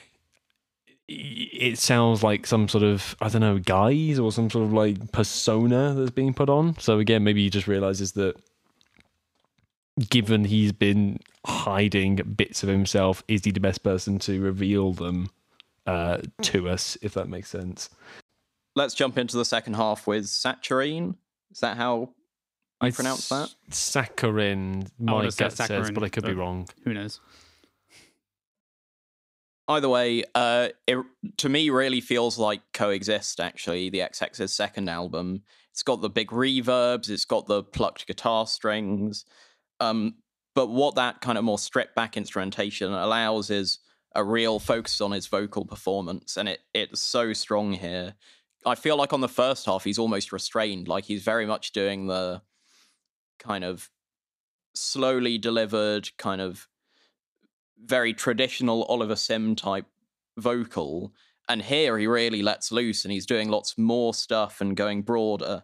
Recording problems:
none

